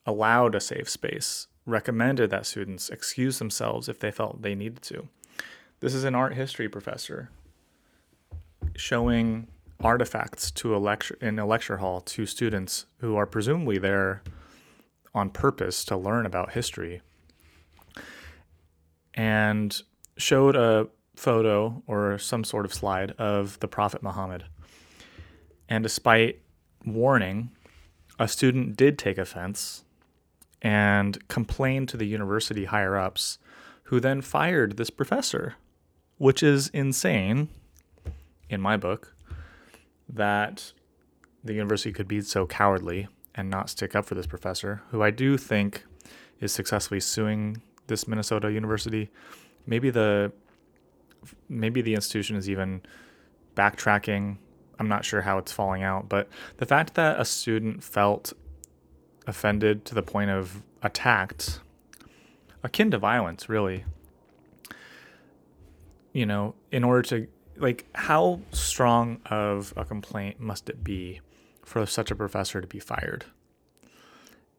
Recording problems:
none

